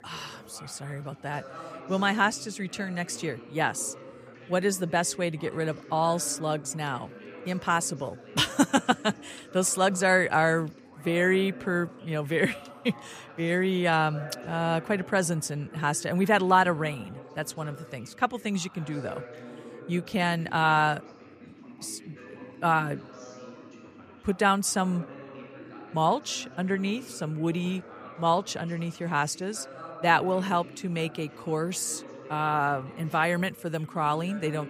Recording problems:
background chatter; noticeable; throughout; 3 voices, 20 dB below the speech

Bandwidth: 15 kHz